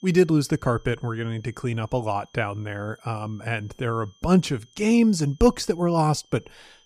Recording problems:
high-pitched whine; faint; throughout; 3 kHz, 35 dB below the speech

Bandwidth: 15 kHz